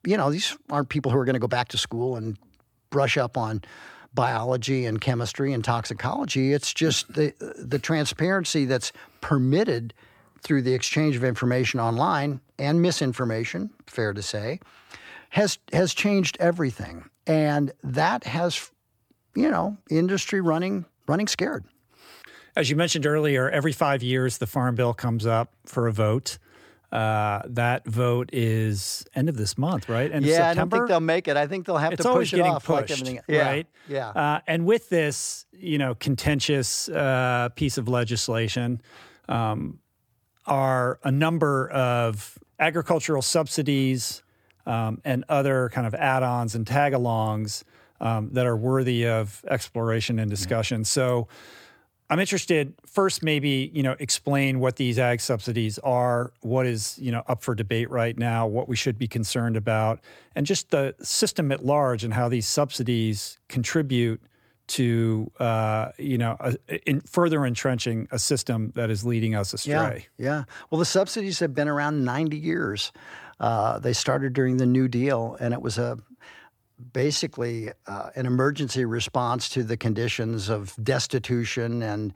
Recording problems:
uneven, jittery; strongly; from 1 s to 1:18

